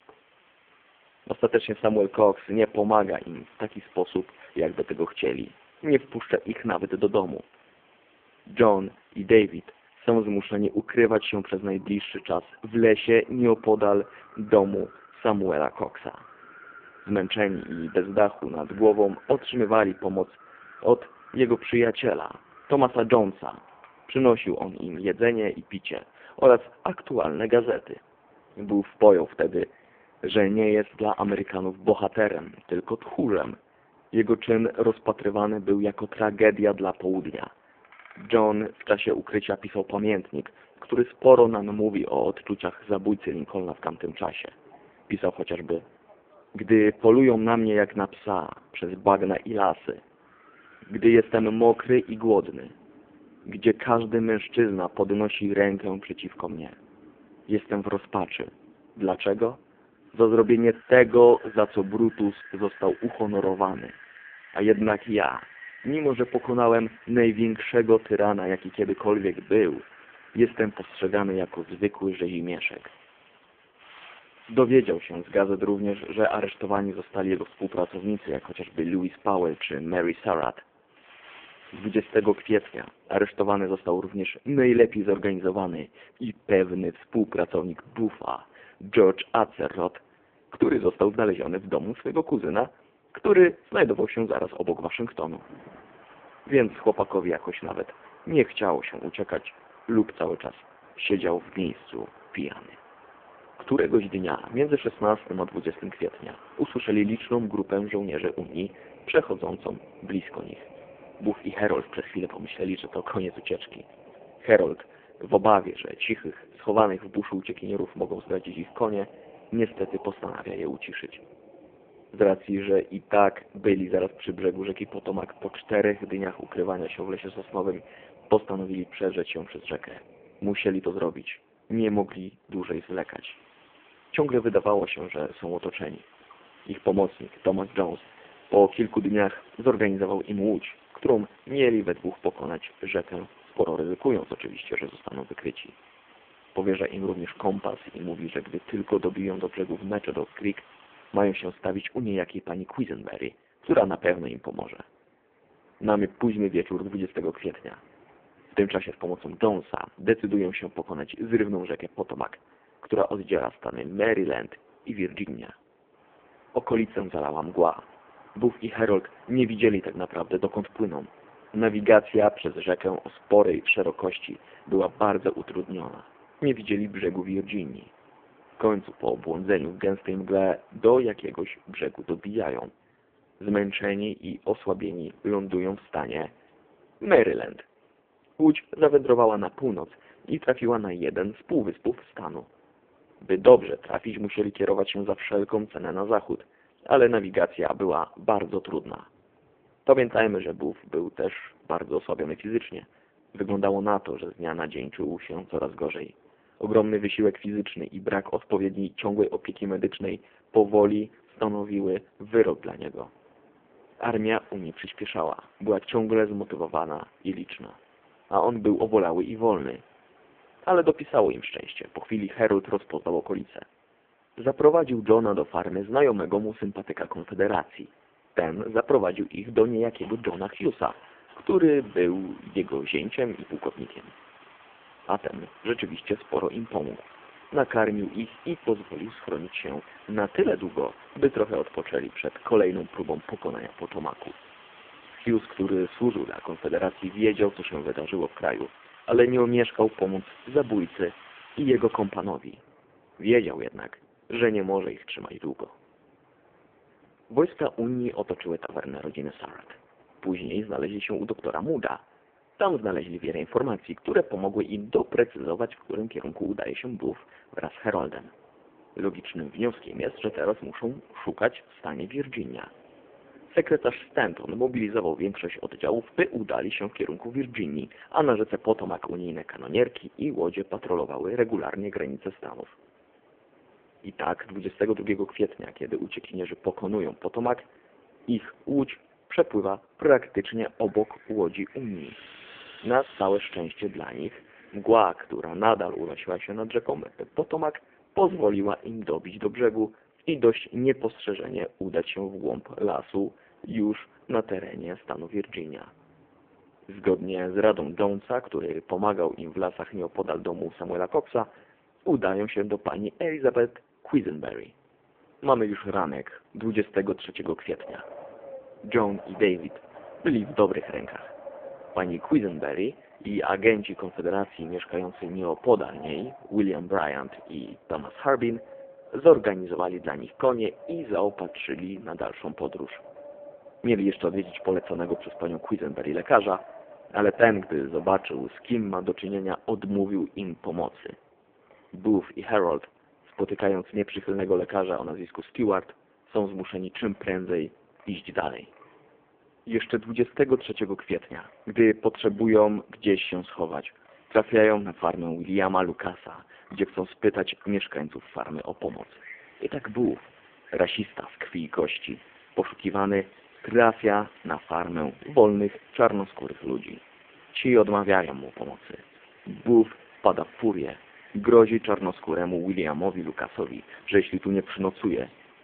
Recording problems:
phone-call audio; poor line
wind in the background; faint; throughout; 25 dB below the speech

